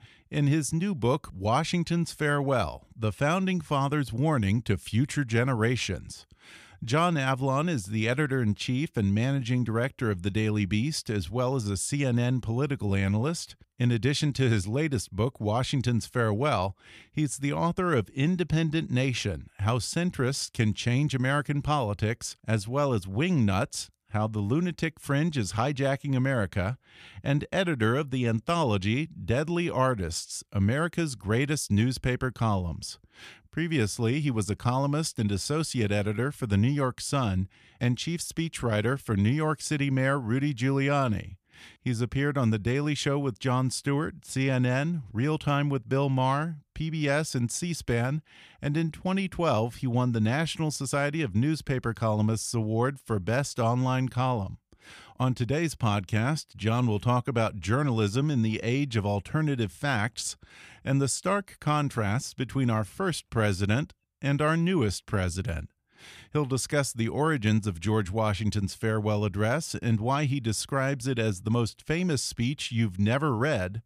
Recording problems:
none

